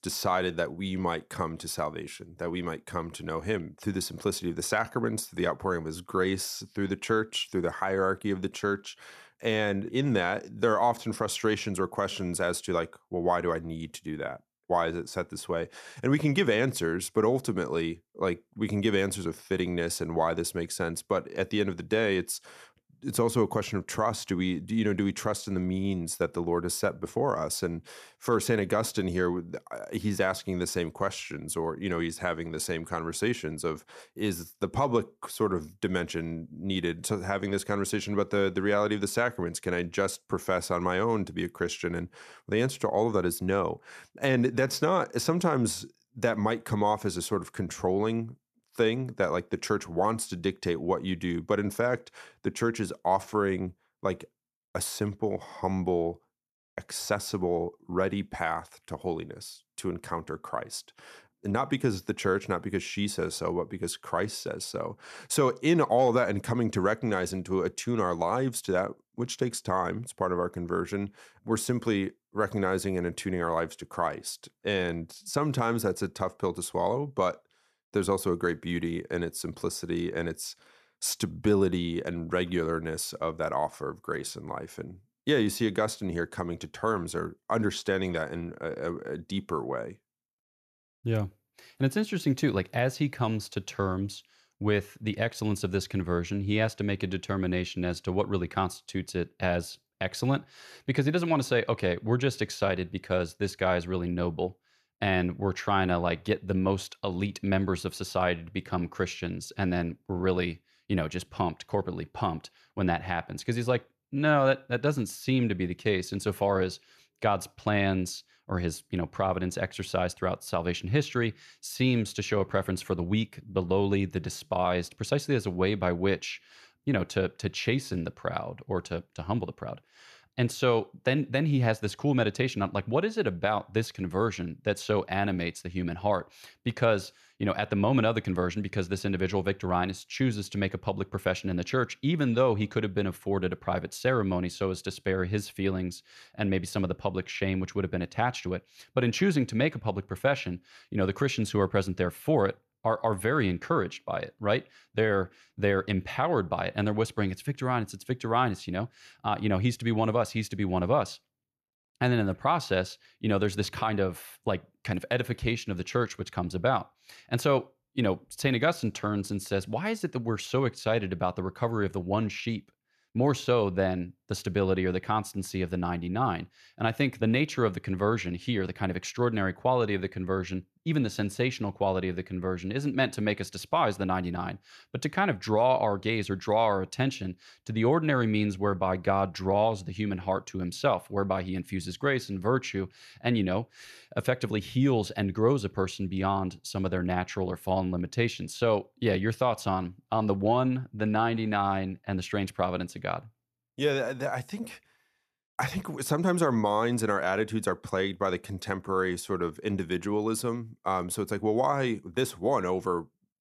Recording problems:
none

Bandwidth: 14 kHz